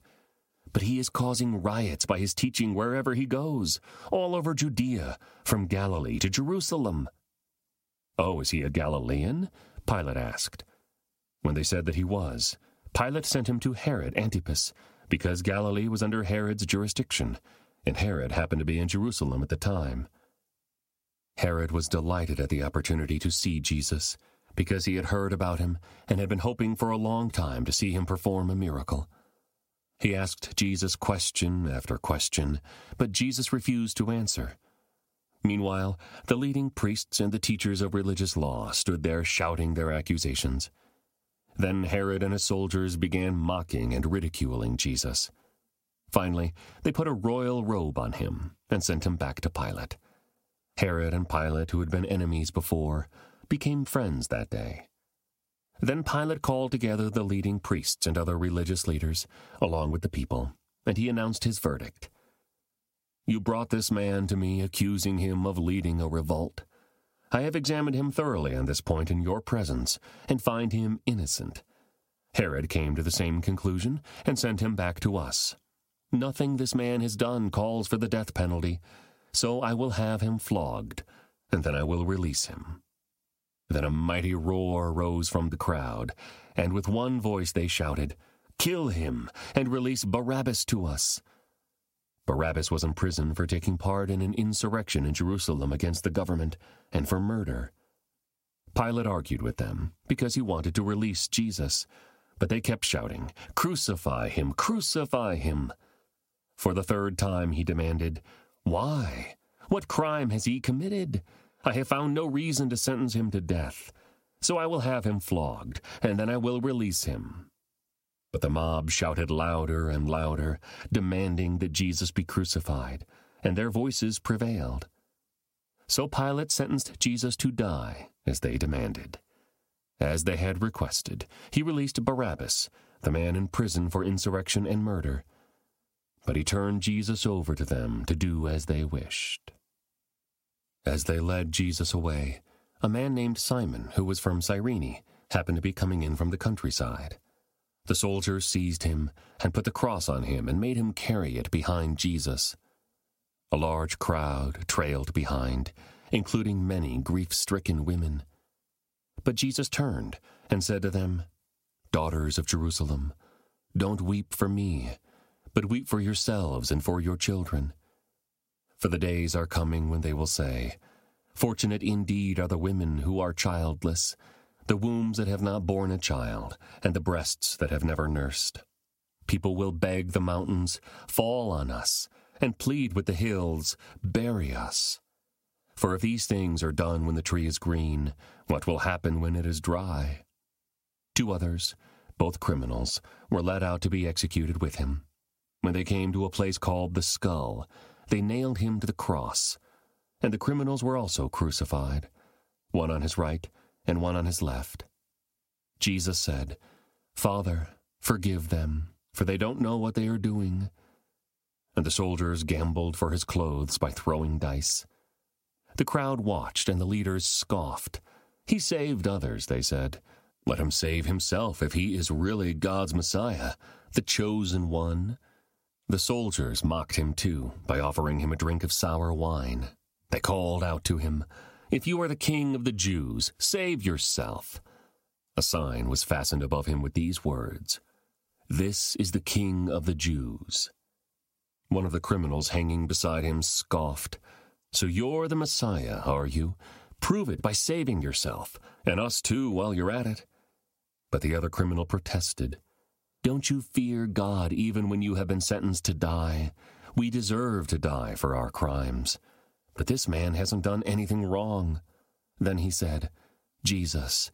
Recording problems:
squashed, flat; somewhat

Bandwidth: 16 kHz